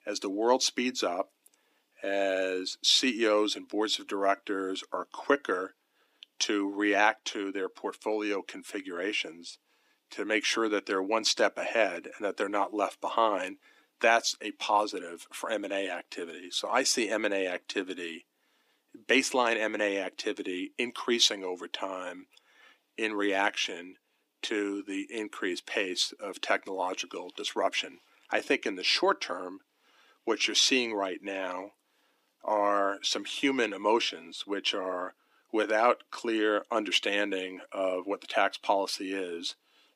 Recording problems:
thin; somewhat; fading below 250 Hz

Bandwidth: 15 kHz